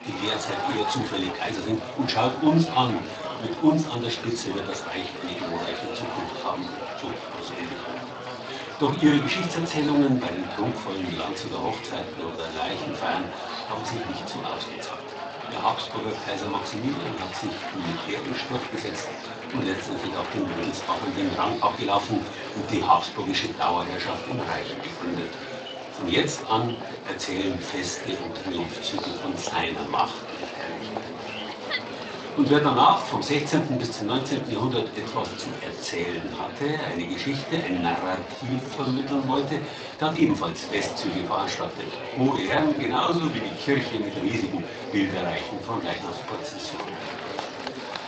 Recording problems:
off-mic speech; far
room echo; slight; dies away in 0.3 s
garbled, watery; slightly; nothing above 7.5 kHz
thin; very slightly; fading below 950 Hz
murmuring crowd; loud; throughout; 7 dB below the speech
uneven, jittery; strongly; from 1 to 47 s

